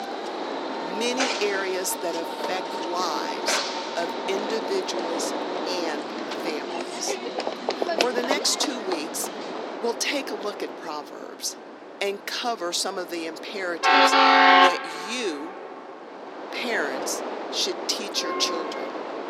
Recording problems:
thin; somewhat; fading below 250 Hz
train or aircraft noise; very loud; throughout; 4 dB above the speech

